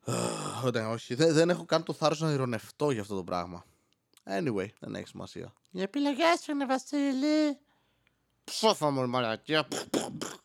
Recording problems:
none

